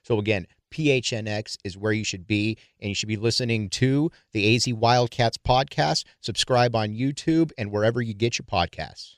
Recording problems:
none

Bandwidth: 14.5 kHz